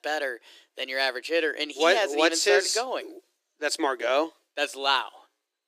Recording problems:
thin; very; fading below 300 Hz

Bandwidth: 15 kHz